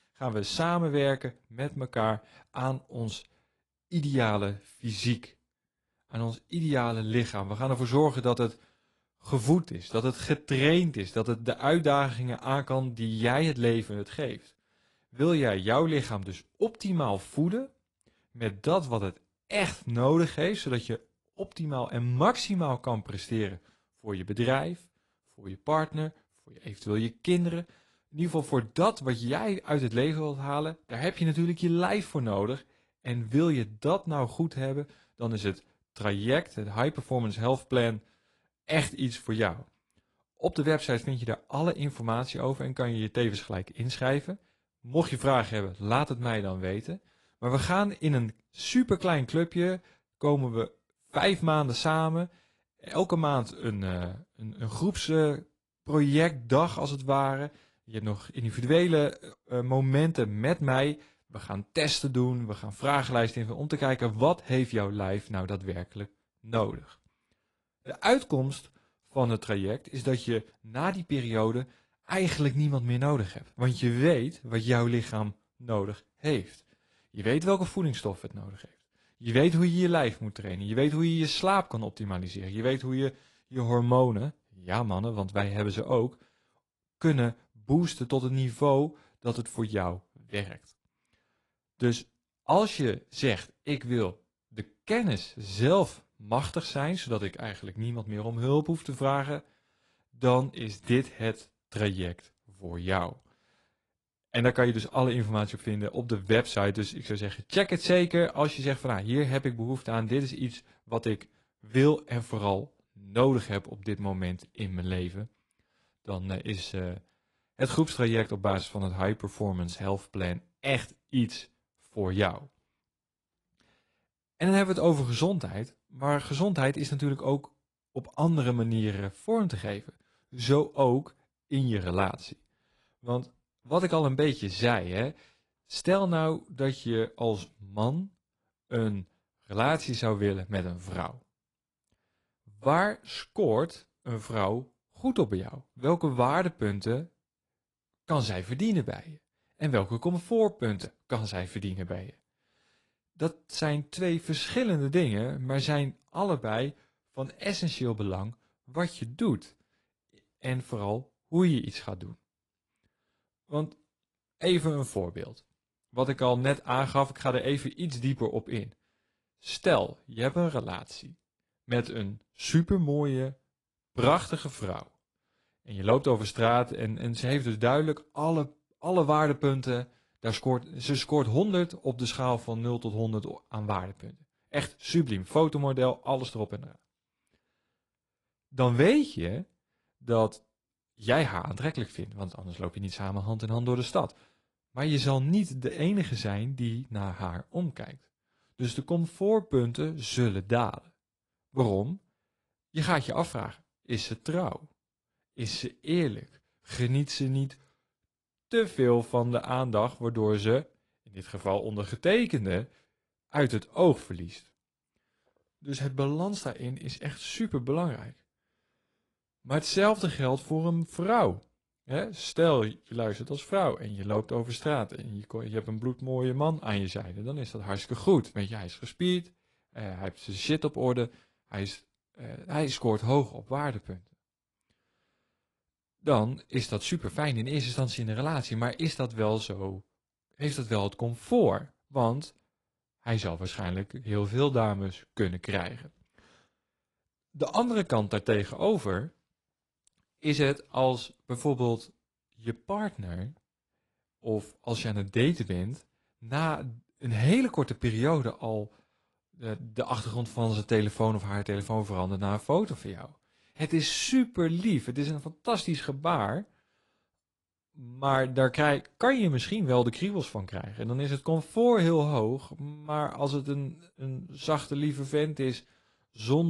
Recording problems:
garbled, watery; slightly; nothing above 10.5 kHz
abrupt cut into speech; at the end

